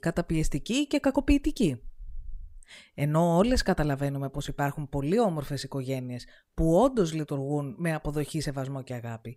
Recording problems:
none

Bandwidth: 15.5 kHz